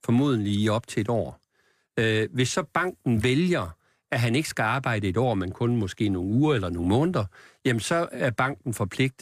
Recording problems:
none

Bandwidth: 15 kHz